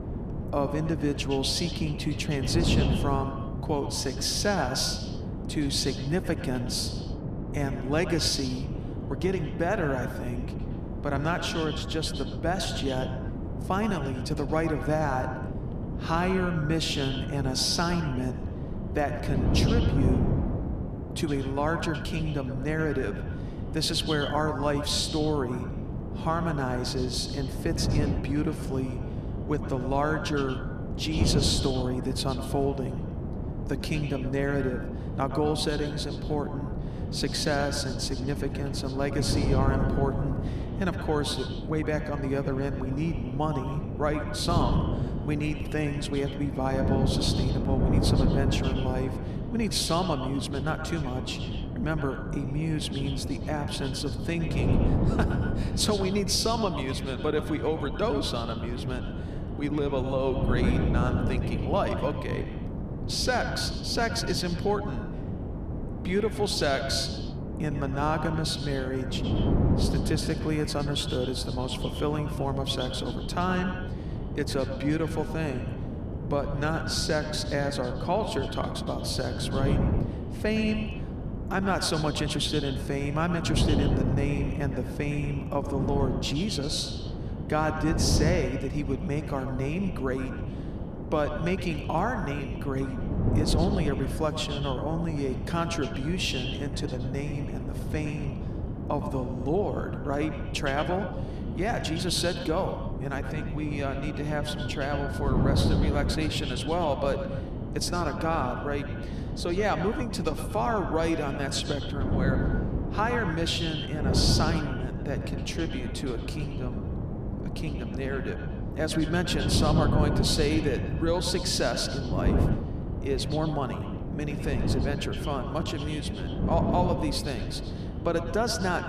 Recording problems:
echo of what is said; strong; throughout; 110 ms later, 10 dB below the speech
wind noise on the microphone; heavy; 8 dB below the speech

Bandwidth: 14.5 kHz